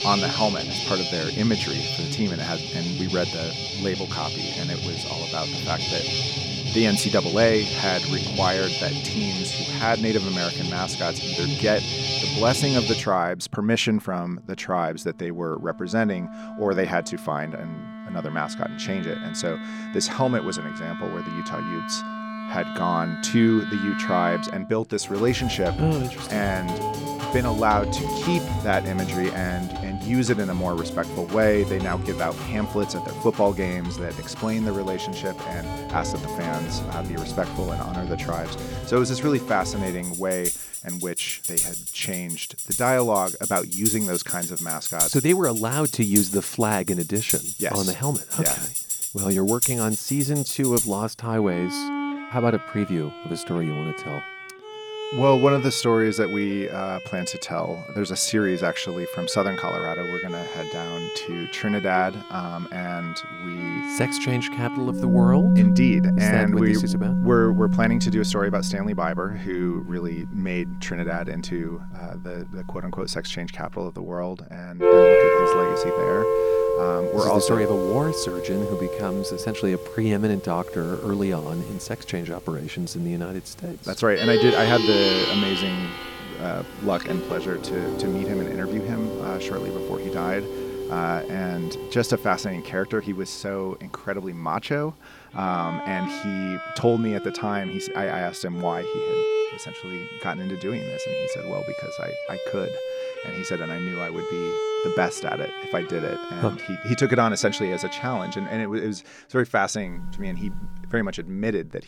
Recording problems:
background music; loud; throughout; 1 dB below the speech

